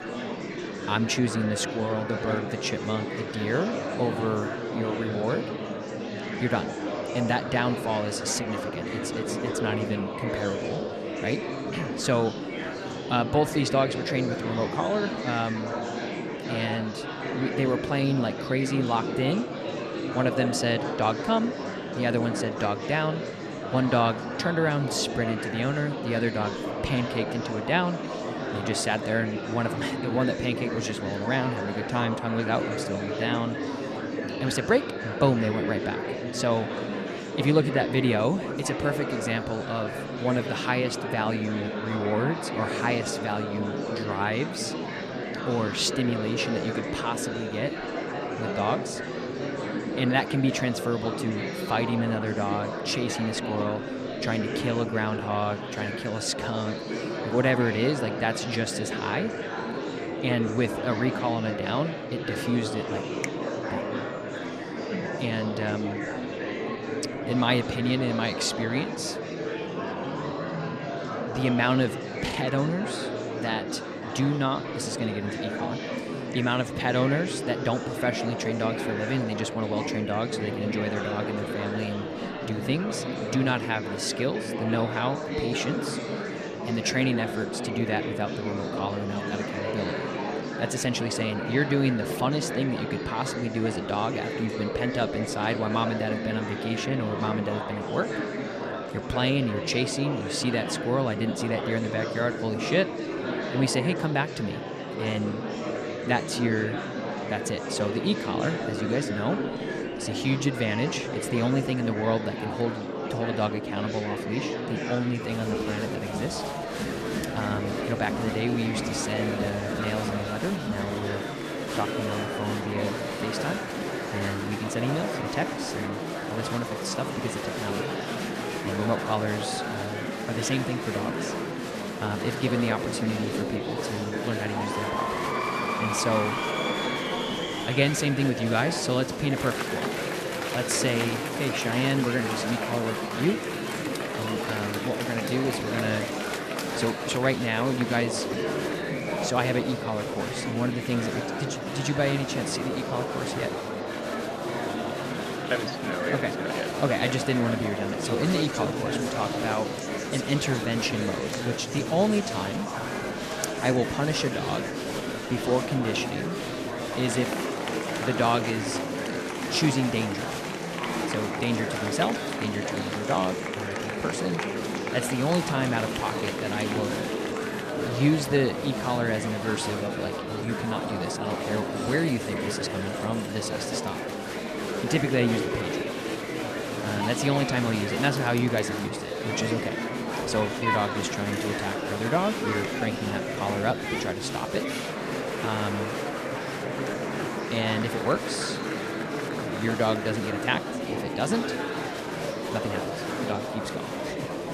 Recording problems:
murmuring crowd; loud; throughout; 2 dB below the speech

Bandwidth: 14 kHz